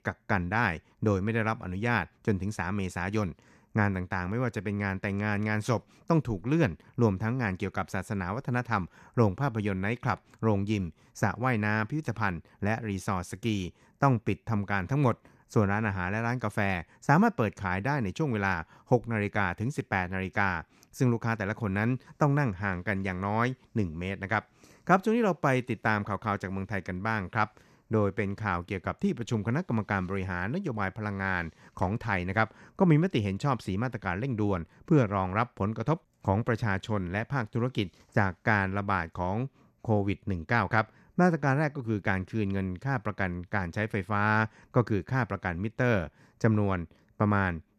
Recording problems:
none

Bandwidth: 14 kHz